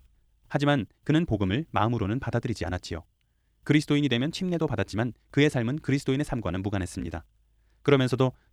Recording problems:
wrong speed, natural pitch; too fast; 1.5 times normal speed

